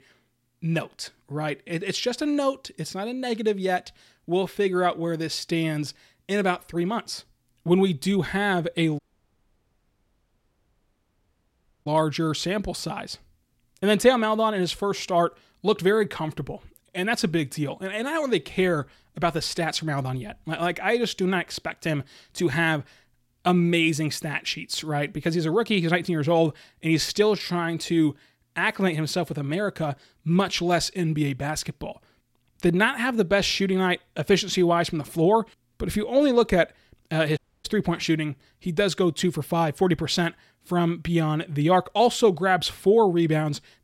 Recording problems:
audio cutting out; at 9 s for 3 s and at 37 s

